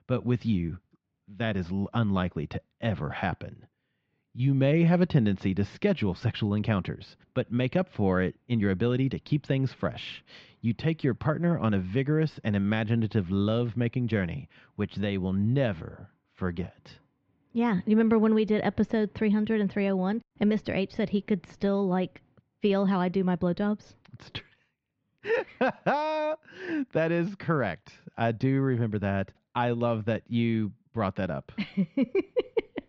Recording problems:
muffled; very; fading above 2.5 kHz
high frequencies cut off; slight; nothing above 8 kHz

